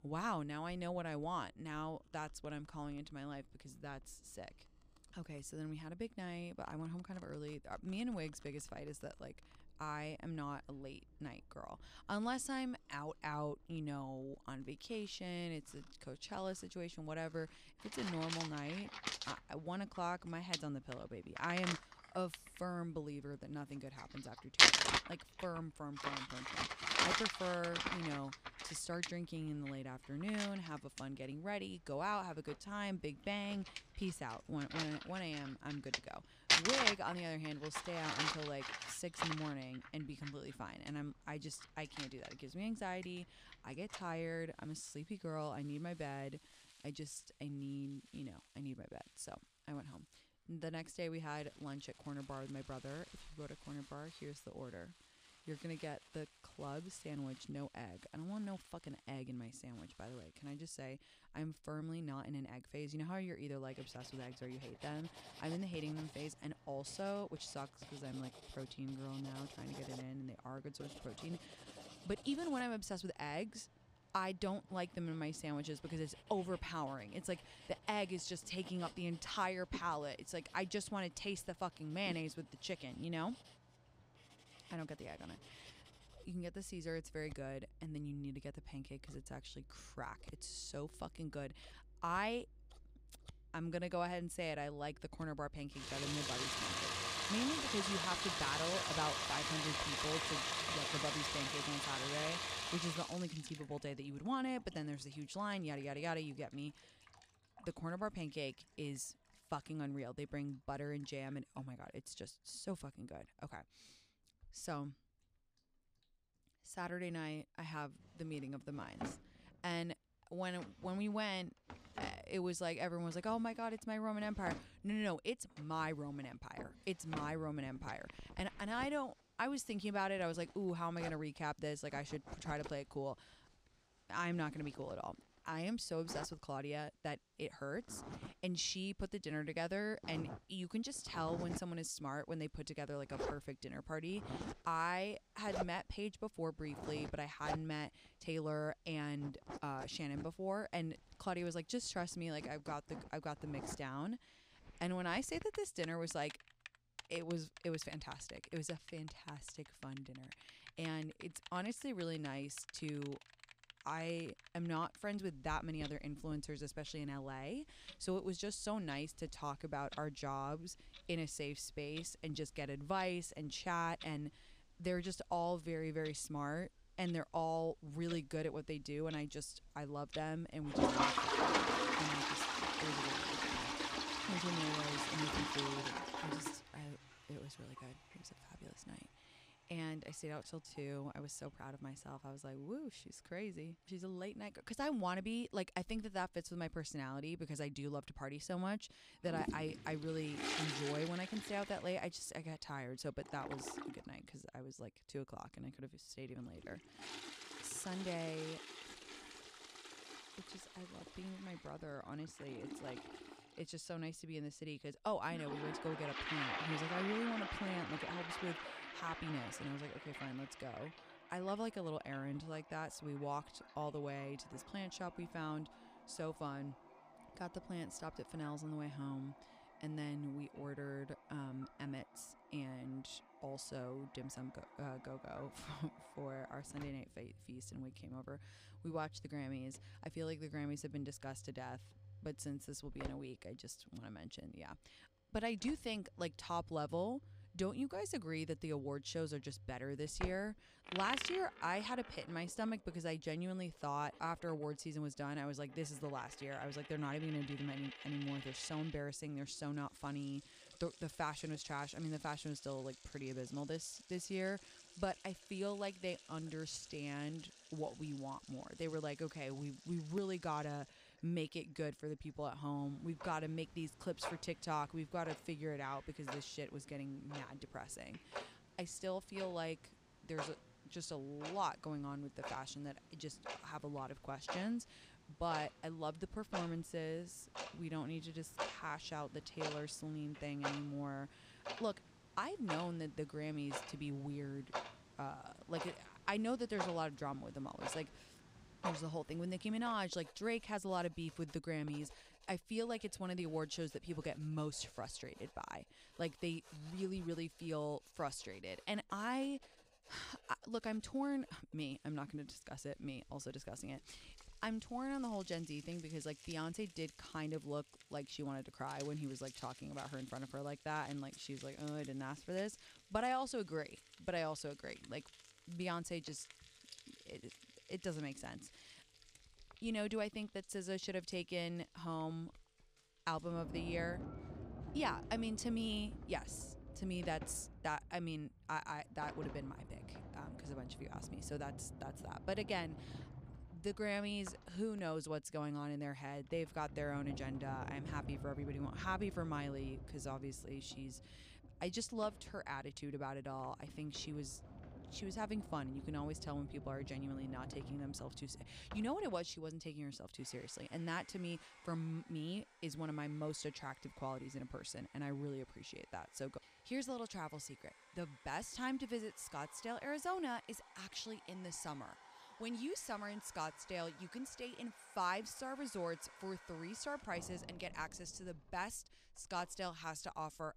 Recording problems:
household noises; very loud; throughout; 1 dB above the speech

